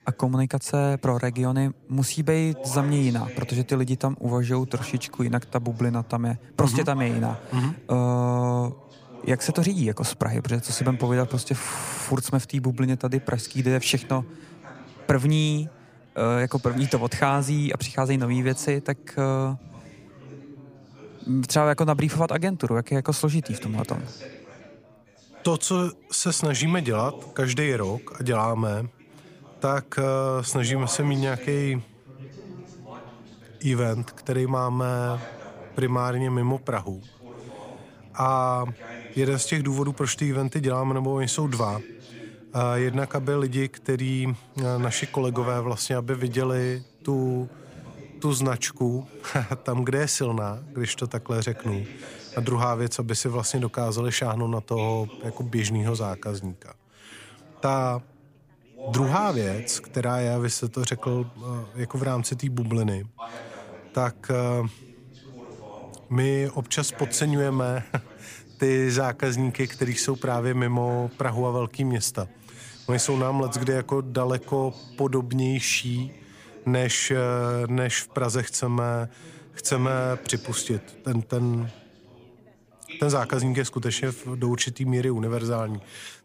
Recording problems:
background chatter; noticeable; throughout; 4 voices, 20 dB below the speech

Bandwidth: 15 kHz